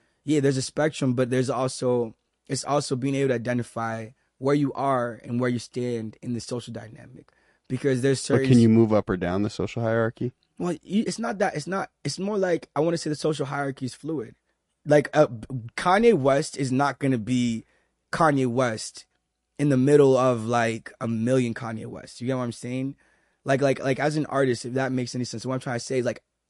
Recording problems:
garbled, watery; slightly

